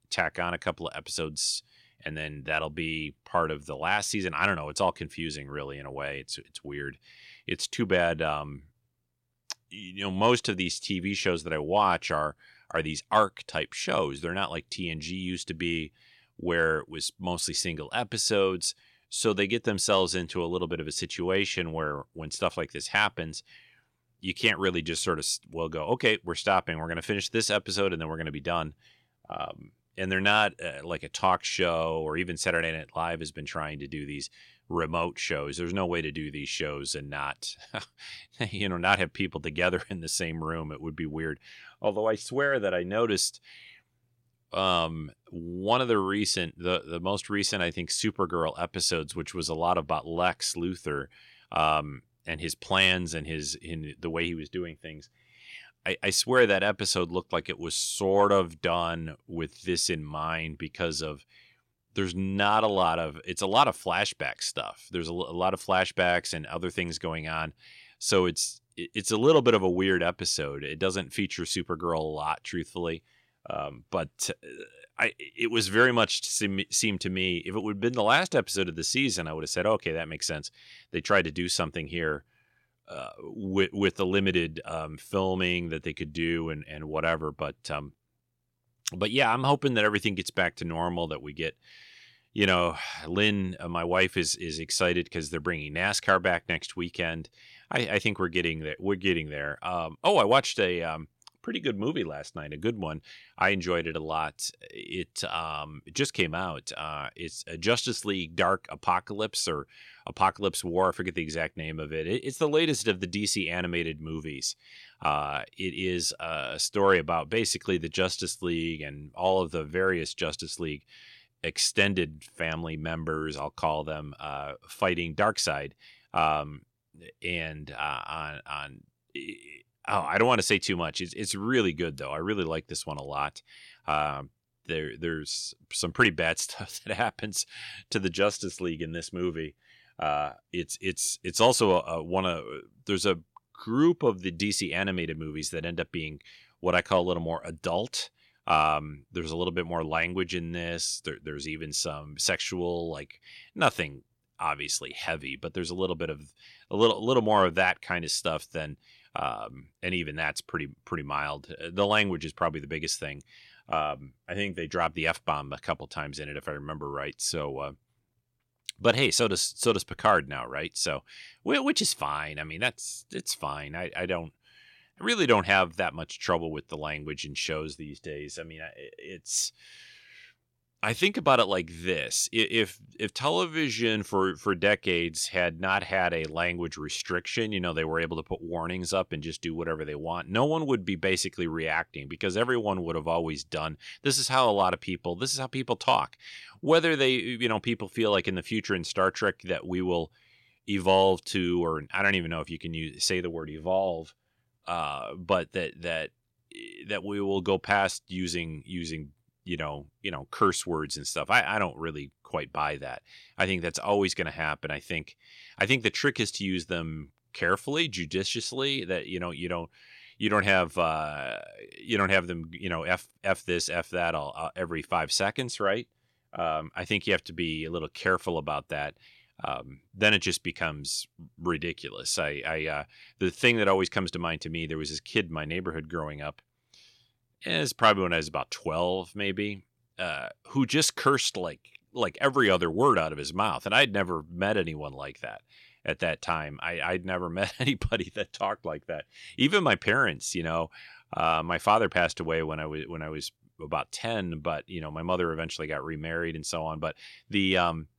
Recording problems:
none

